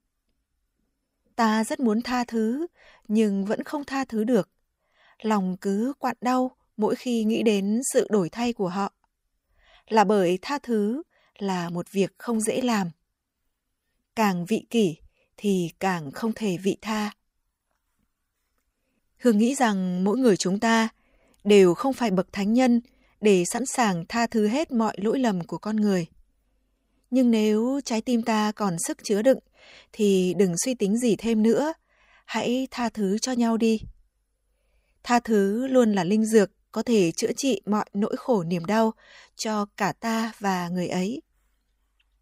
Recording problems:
none

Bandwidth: 15.5 kHz